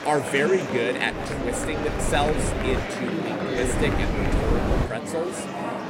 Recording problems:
wind noise on the microphone; heavy; from 1 to 3 s and from 3.5 to 5 s; 5 dB below the speech
murmuring crowd; loud; throughout; 2 dB below the speech

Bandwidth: 16 kHz